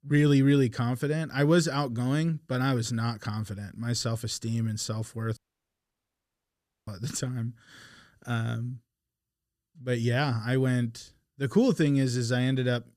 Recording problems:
audio cutting out; at 5.5 s for 1.5 s

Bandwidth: 14.5 kHz